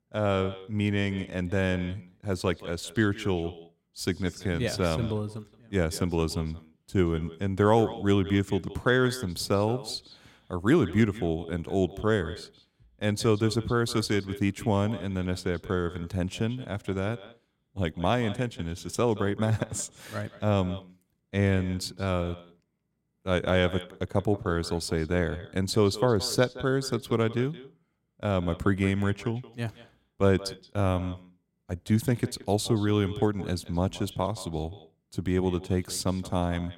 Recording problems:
echo of what is said; noticeable; throughout; 170 ms later, 15 dB below the speech

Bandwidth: 16 kHz